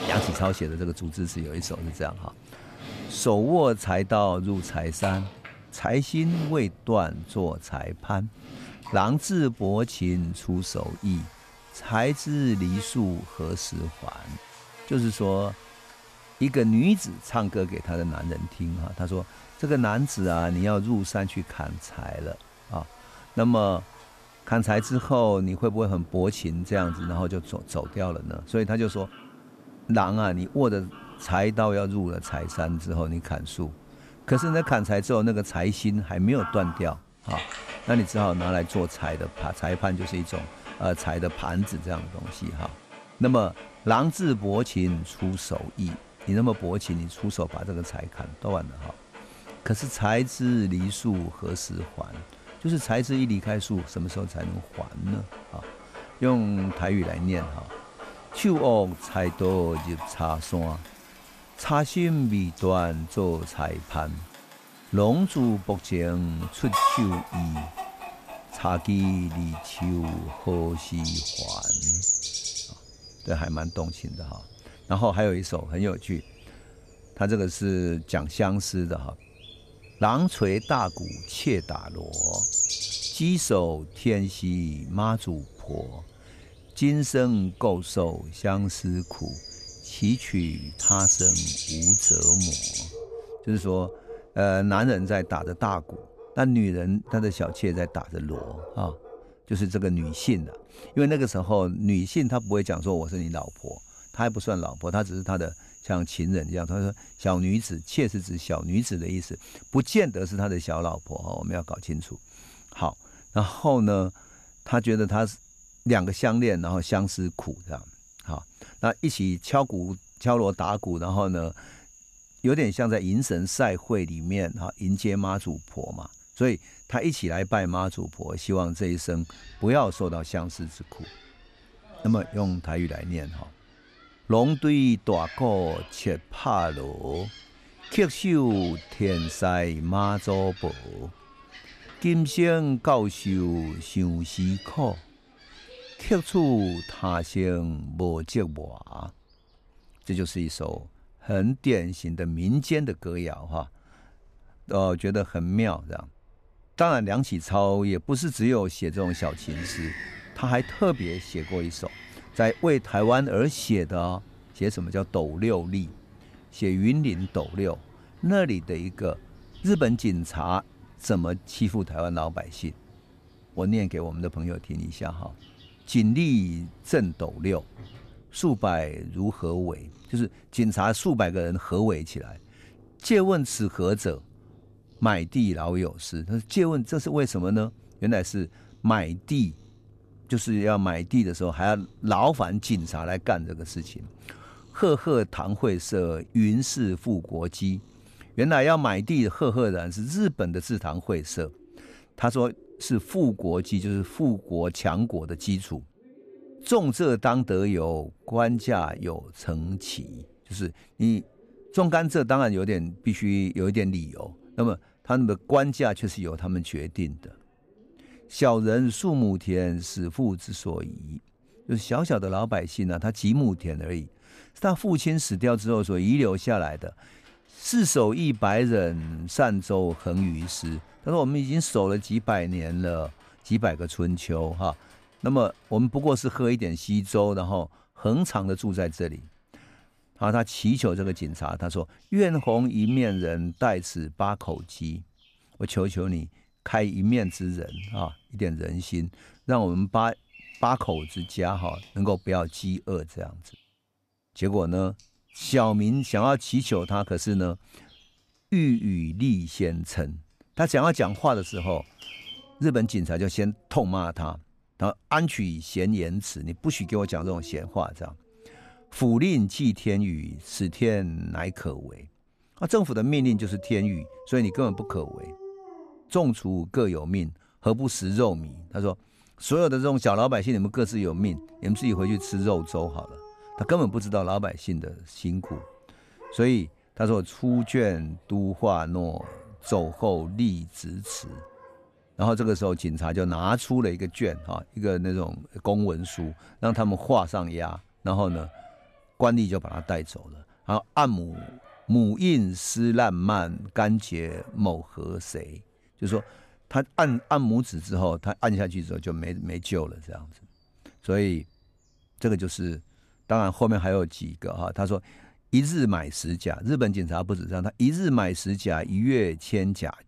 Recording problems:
animal sounds; loud; throughout; 8 dB below the speech

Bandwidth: 14.5 kHz